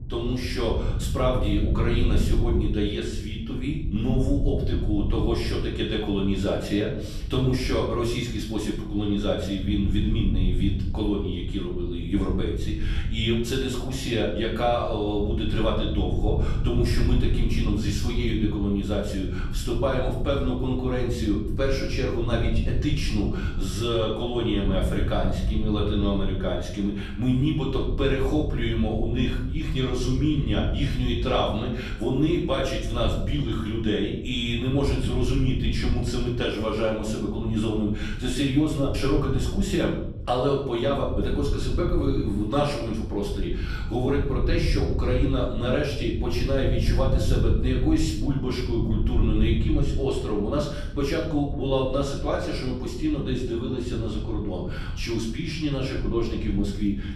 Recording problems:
off-mic speech; far
room echo; noticeable; dies away in 0.5 s
wind noise on the microphone; occasional gusts; 15 dB below the speech

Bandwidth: 14 kHz